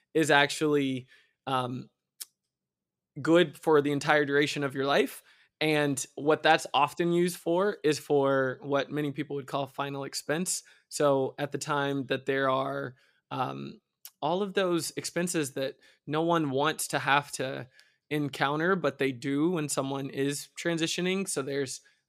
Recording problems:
none

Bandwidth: 15.5 kHz